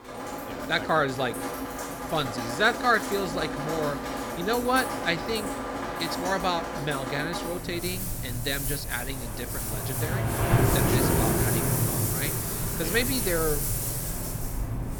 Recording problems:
rain or running water; very loud; throughout; as loud as the speech

